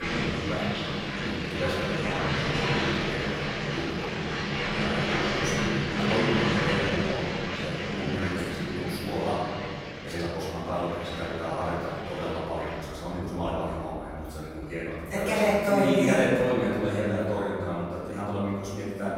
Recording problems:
room echo; strong; dies away in 1.6 s
off-mic speech; far
household noises; very loud; throughout; as loud as the speech
abrupt cut into speech; at the start
uneven, jittery; strongly; from 1 to 18 s

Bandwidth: 16 kHz